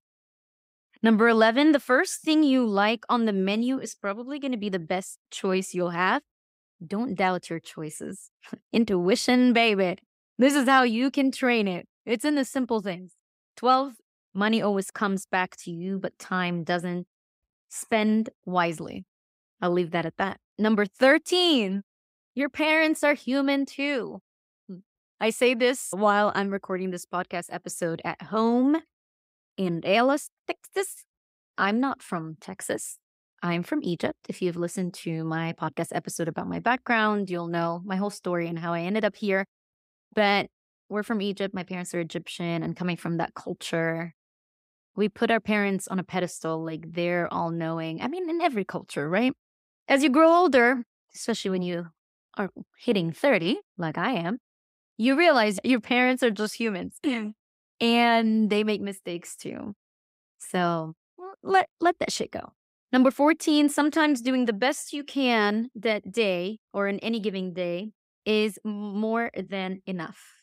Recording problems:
none

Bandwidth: 15.5 kHz